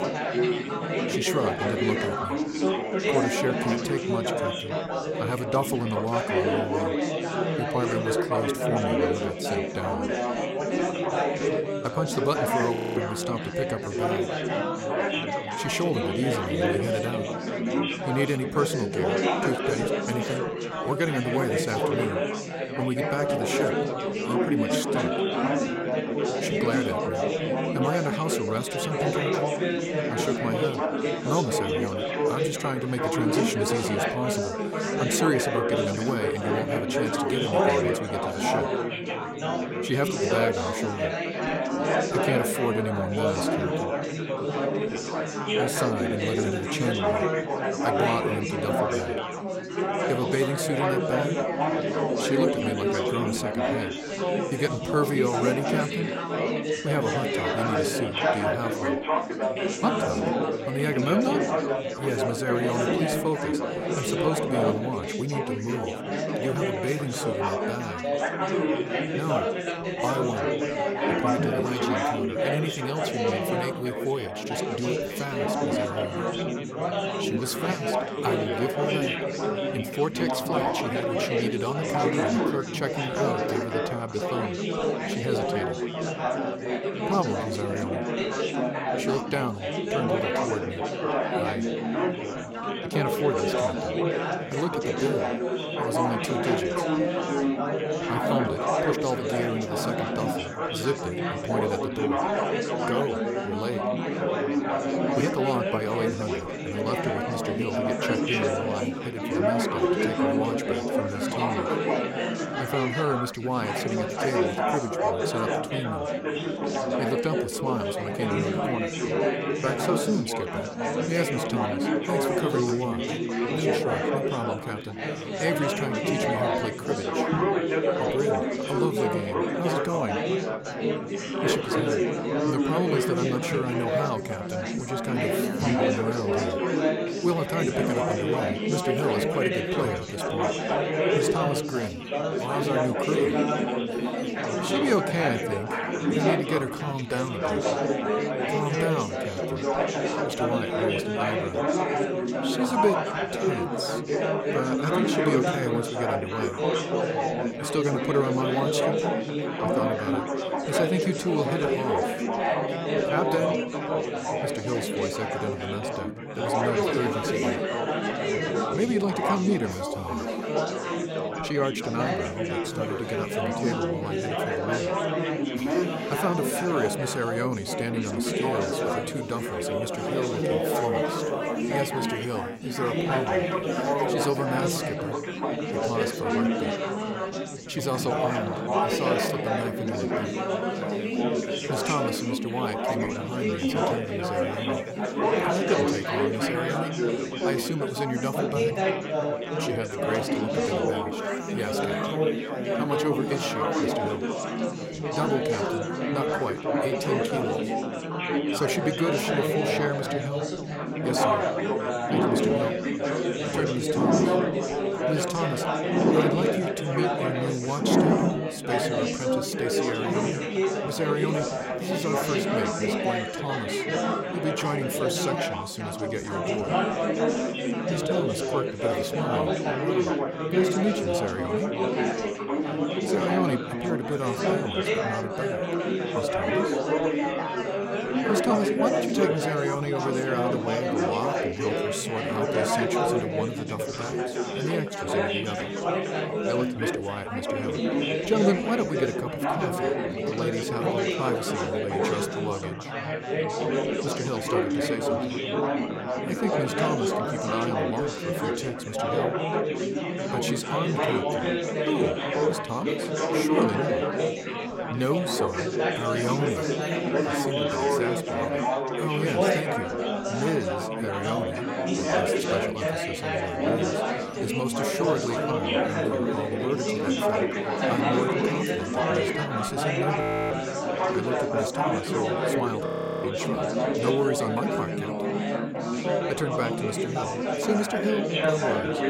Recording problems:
chatter from many people; very loud; throughout; 4 dB above the speech
machinery noise; faint; throughout; 30 dB below the speech
audio freezing; at 13 s, at 4:40 and at 4:43

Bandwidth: 16 kHz